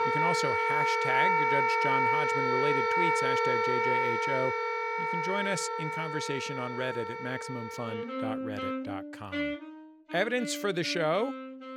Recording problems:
background music; very loud; throughout; 5 dB above the speech

